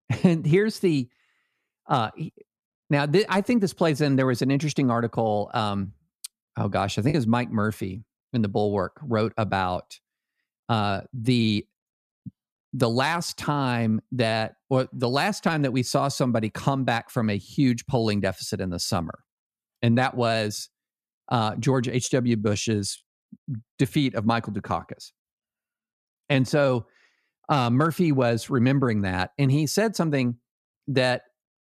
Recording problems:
choppy; occasionally; at 7 s; 2% of the speech affected

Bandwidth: 14.5 kHz